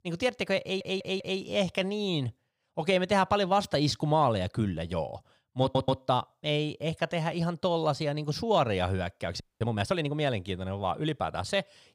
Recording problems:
audio stuttering; at 0.5 s and at 5.5 s
audio freezing; at 9.5 s

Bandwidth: 15.5 kHz